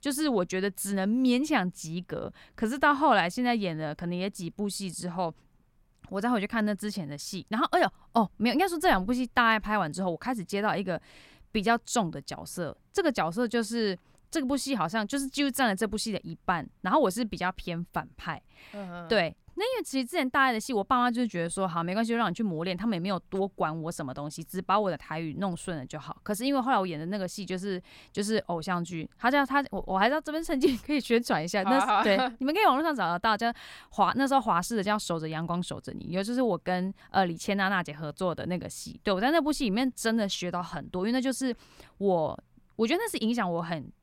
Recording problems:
none

